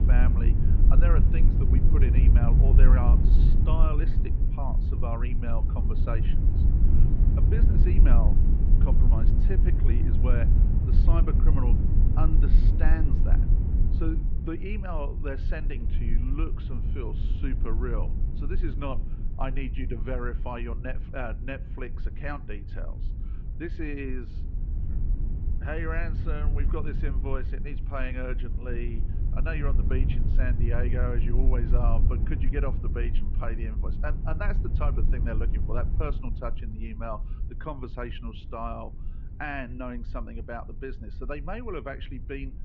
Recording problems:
muffled; very; fading above 3 kHz
high frequencies cut off; slight; nothing above 8 kHz
low rumble; loud; throughout; 5 dB below the speech

